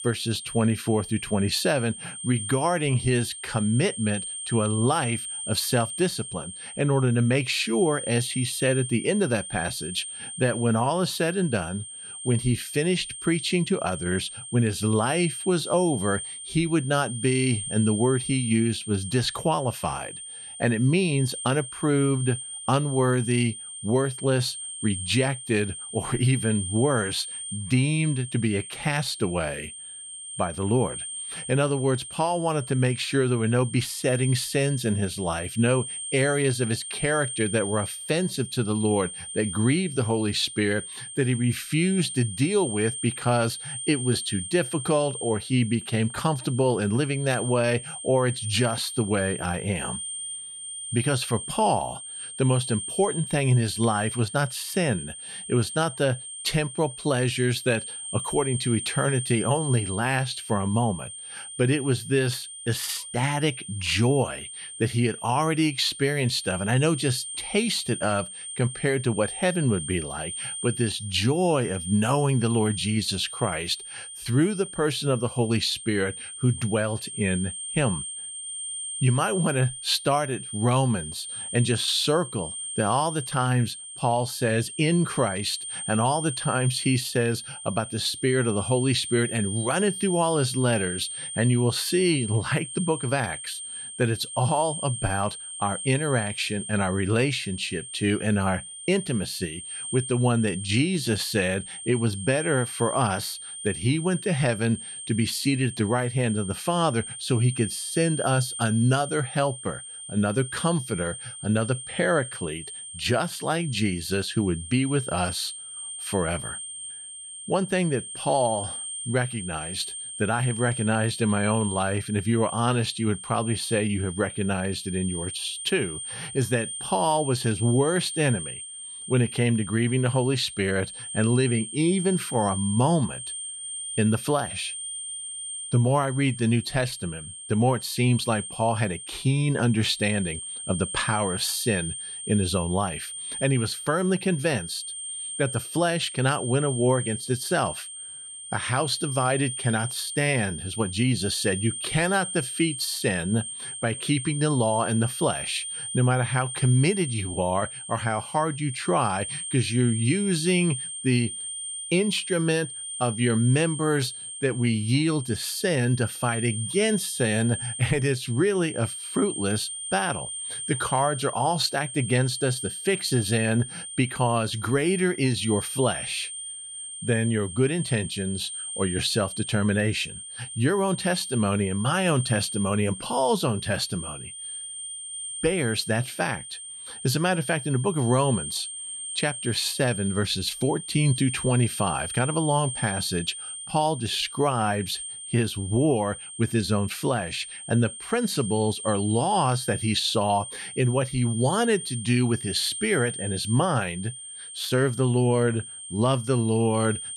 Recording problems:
high-pitched whine; loud; throughout; 8.5 kHz, 8 dB below the speech

